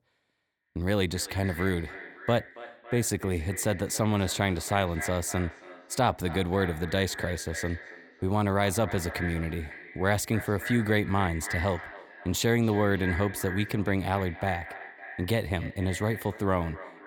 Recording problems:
echo of what is said; strong; throughout; 280 ms later, 10 dB below the speech

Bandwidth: 18.5 kHz